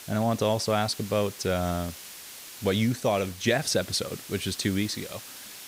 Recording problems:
hiss; noticeable; throughout; 15 dB below the speech

